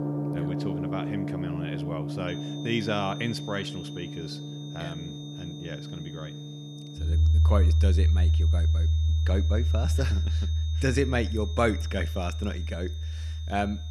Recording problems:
background music; very loud; throughout; 5 dB above the speech
high-pitched whine; noticeable; from 2.5 s on; 3.5 kHz, 10 dB below the speech

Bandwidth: 15 kHz